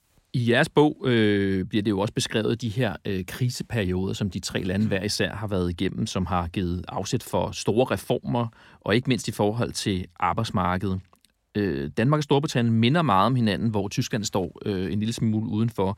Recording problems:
none

